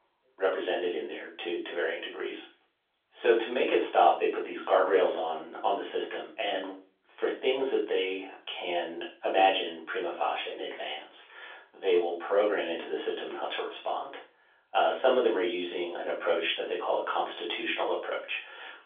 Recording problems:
off-mic speech; far
room echo; slight; dies away in 0.3 s
phone-call audio; nothing above 3.5 kHz

